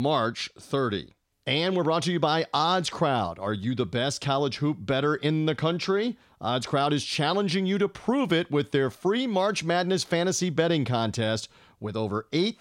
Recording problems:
abrupt cut into speech; at the start

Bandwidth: 16 kHz